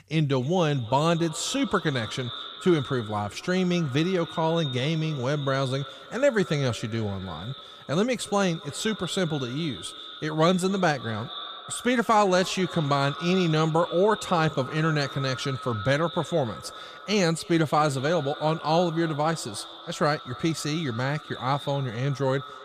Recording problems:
echo of what is said; noticeable; throughout; 270 ms later, 15 dB below the speech

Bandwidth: 14.5 kHz